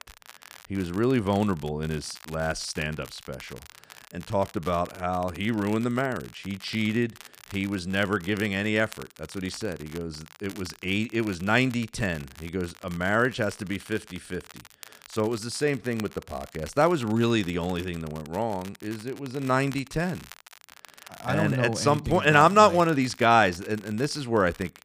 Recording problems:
crackle, like an old record; faint; 20 dB below the speech

